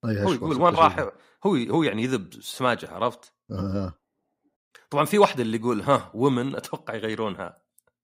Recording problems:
none

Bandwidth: 15.5 kHz